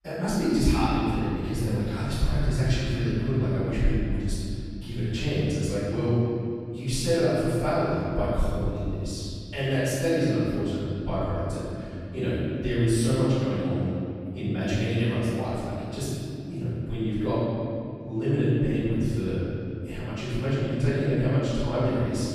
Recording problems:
room echo; strong; dies away in 2.6 s
off-mic speech; far

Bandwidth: 15 kHz